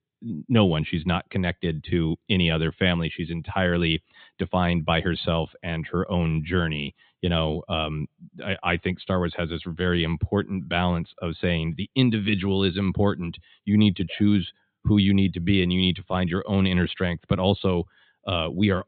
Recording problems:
high frequencies cut off; severe; nothing above 4 kHz

